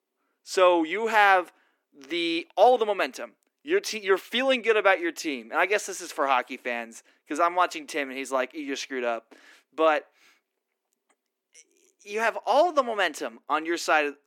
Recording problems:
thin; somewhat; fading below 300 Hz

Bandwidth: 17.5 kHz